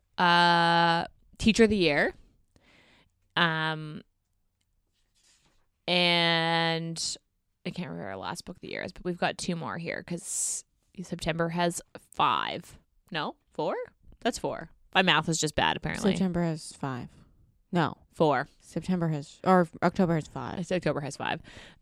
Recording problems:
none

